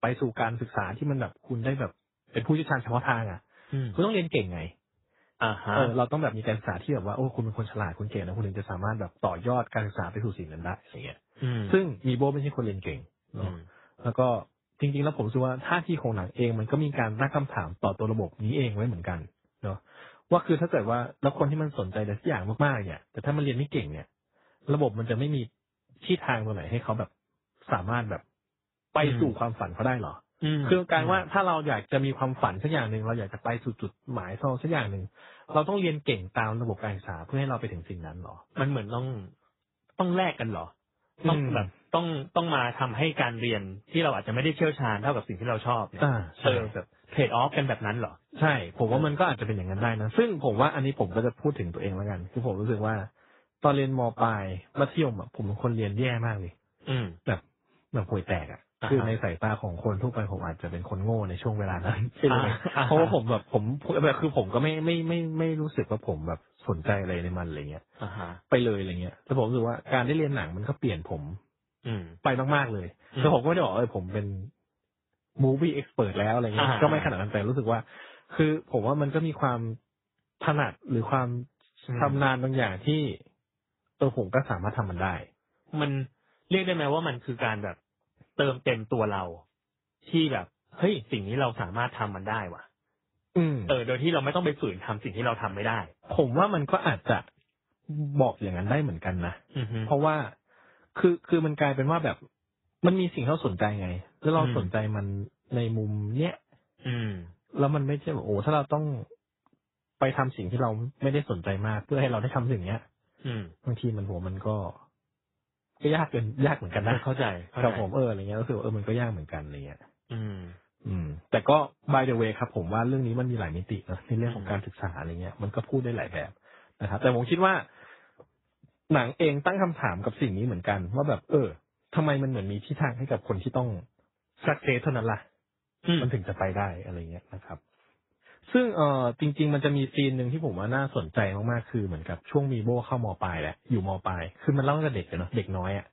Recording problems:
garbled, watery; badly; nothing above 4 kHz

